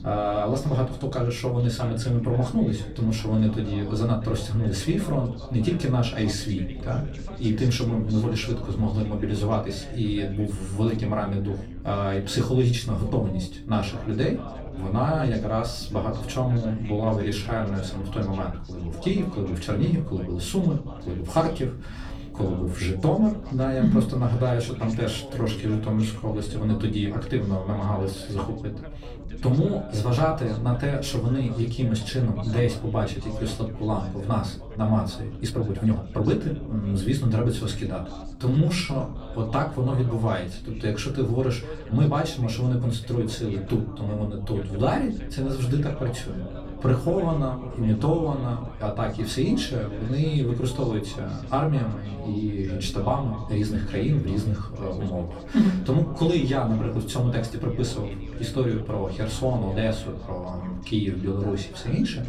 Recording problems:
off-mic speech; far
echo of what is said; faint; from 47 s on; 190 ms later, 20 dB below the speech
room echo; very slight; dies away in 0.3 s
background chatter; noticeable; throughout; 3 voices, 15 dB below the speech
low rumble; noticeable; throughout; 20 dB below the speech
uneven, jittery; strongly; from 17 to 39 s

